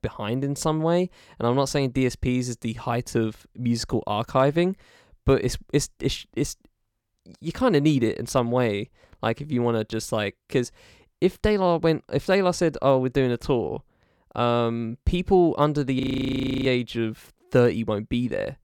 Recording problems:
audio freezing; at 16 s for 0.5 s

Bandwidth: 18 kHz